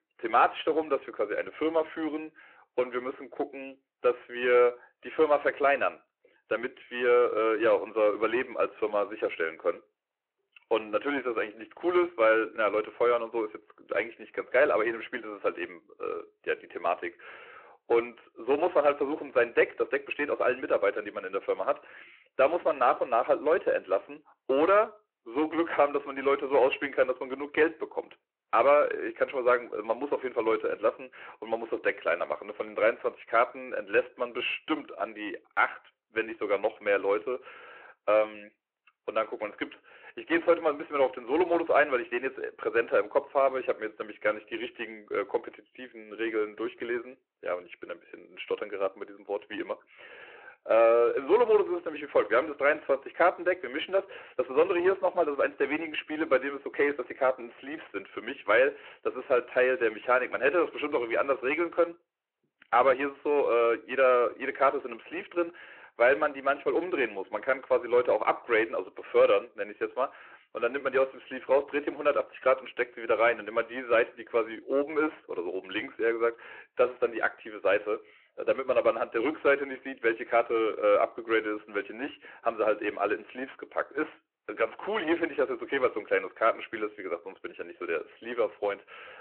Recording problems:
phone-call audio
distortion; slight; 10 dB below the speech

